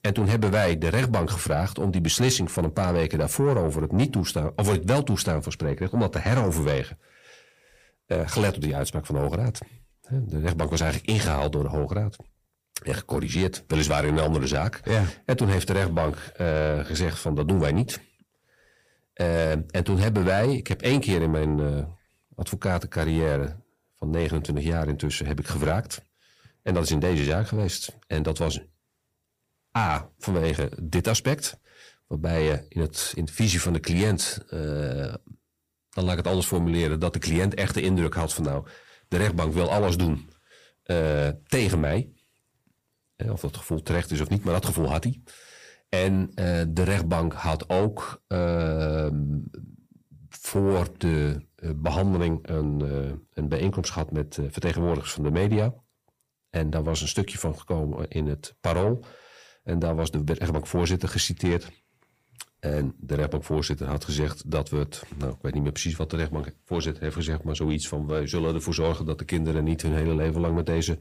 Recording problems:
distortion; slight; 10 dB below the speech

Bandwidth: 15 kHz